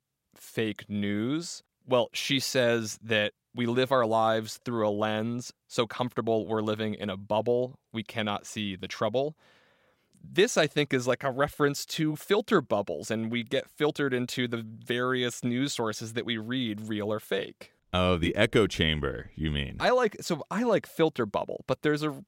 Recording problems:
none

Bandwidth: 16 kHz